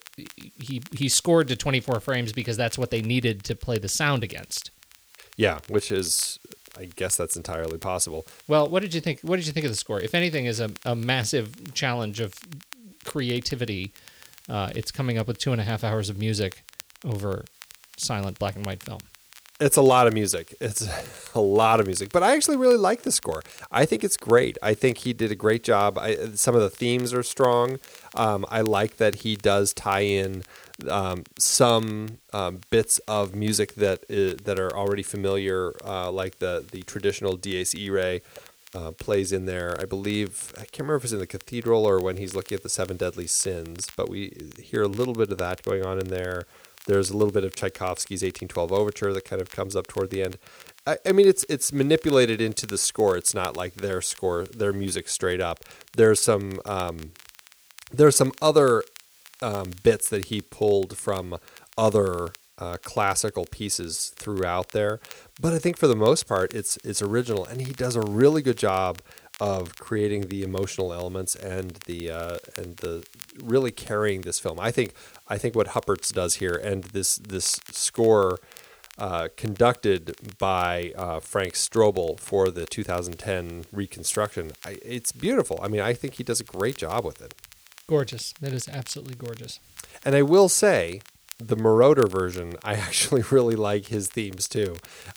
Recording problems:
hiss; faint; throughout; 30 dB below the speech
crackle, like an old record; faint; 25 dB below the speech

